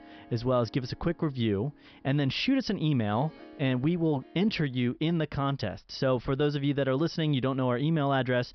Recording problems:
high frequencies cut off; noticeable; nothing above 5.5 kHz
background music; faint; throughout; 25 dB below the speech

